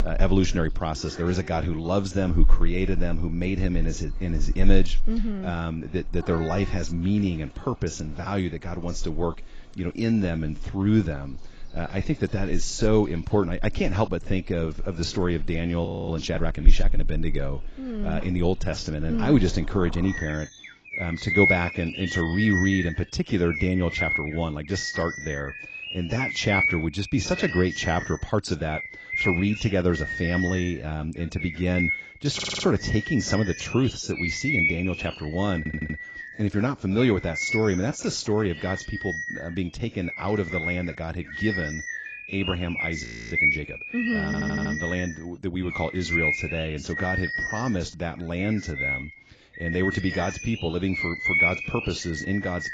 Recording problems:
garbled, watery; badly; nothing above 7.5 kHz
animal sounds; loud; throughout; 2 dB below the speech
audio freezing; at 16 s and at 43 s
audio stuttering; at 32 s, at 36 s and at 44 s

